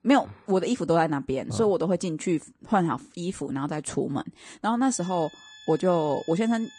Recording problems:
garbled, watery; slightly; nothing above 9 kHz
background music; faint; from 5 s on; 20 dB below the speech

